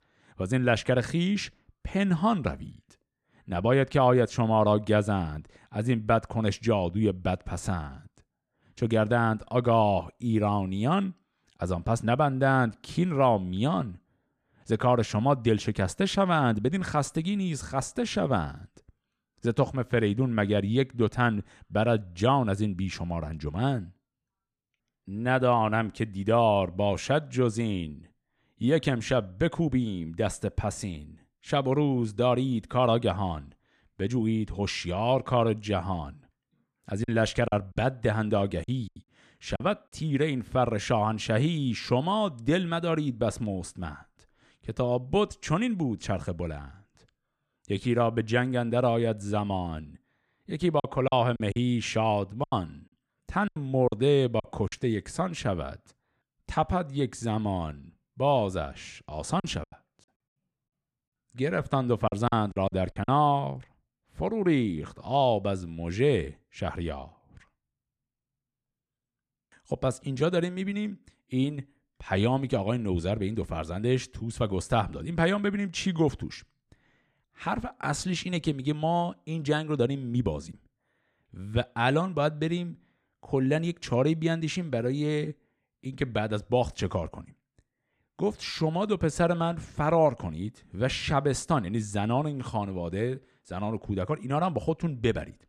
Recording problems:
choppy; very; from 37 to 40 s, from 51 to 55 s and from 59 s to 1:03; 12% of the speech affected

